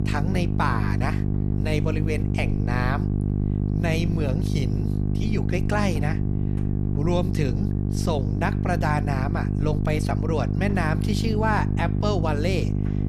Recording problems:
electrical hum; loud; throughout; 50 Hz, 6 dB below the speech

